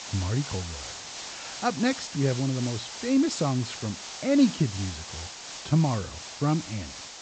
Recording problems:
high frequencies cut off; noticeable; nothing above 8 kHz
hiss; loud; throughout; 10 dB below the speech

